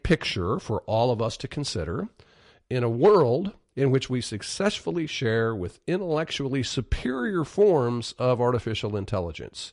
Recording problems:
garbled, watery; slightly; nothing above 10.5 kHz

